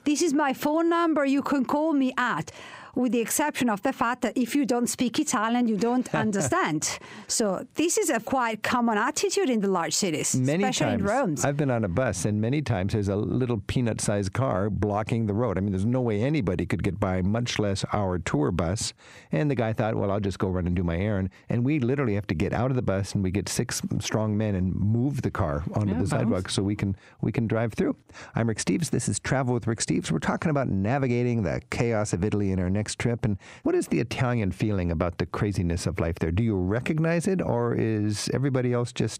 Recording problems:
squashed, flat; heavily

